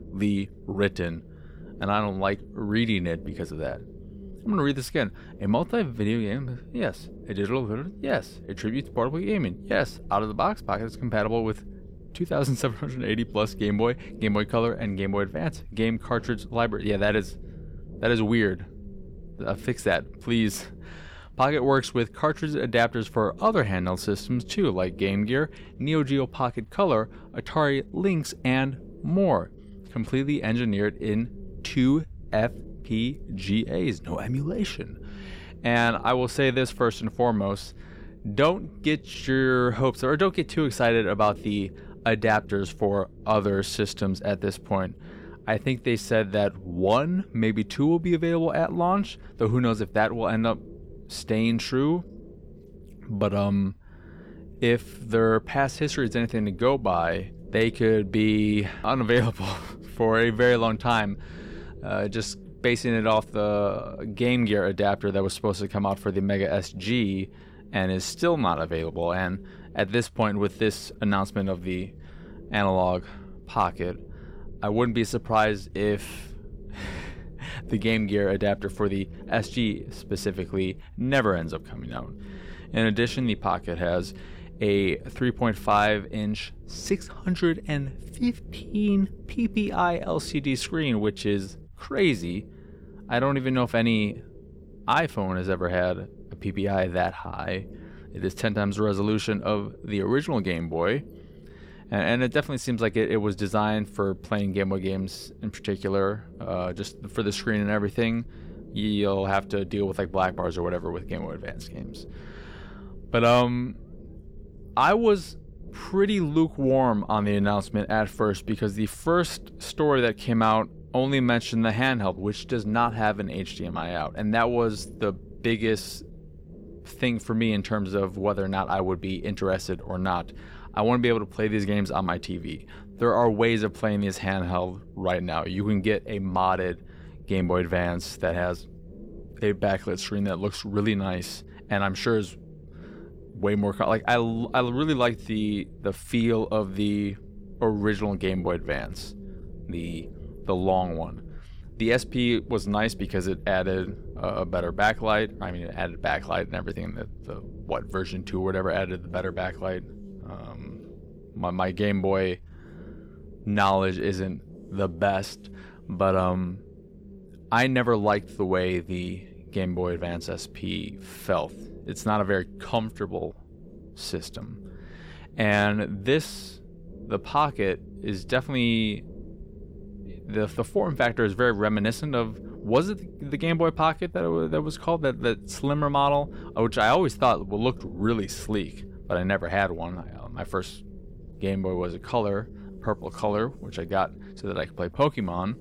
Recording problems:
low rumble; faint; throughout; 25 dB below the speech

